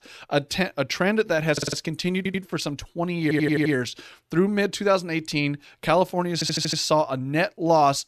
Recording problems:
audio stuttering; 4 times, first at 1.5 s

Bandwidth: 14.5 kHz